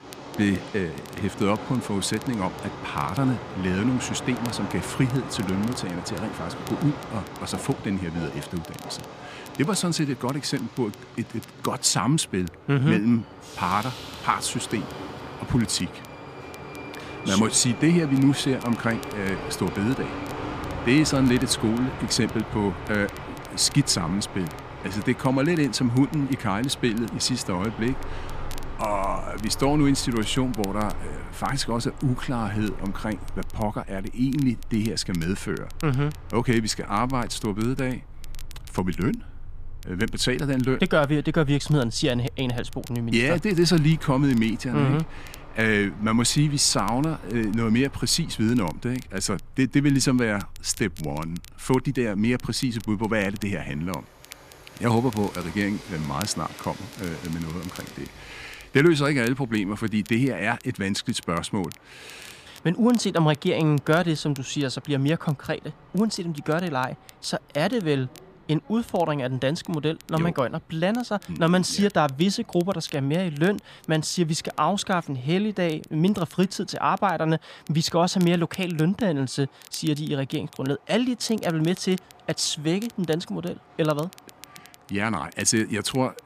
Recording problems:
train or aircraft noise; noticeable; throughout; 15 dB below the speech
crackle, like an old record; faint; 25 dB below the speech

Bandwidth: 14.5 kHz